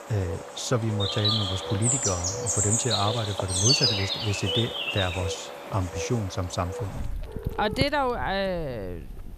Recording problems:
animal sounds; very loud; throughout; 2 dB above the speech

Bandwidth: 14.5 kHz